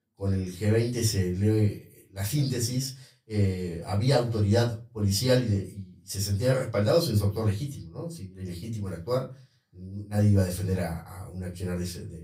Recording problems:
off-mic speech; far
room echo; very slight; dies away in 0.3 s

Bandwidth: 15.5 kHz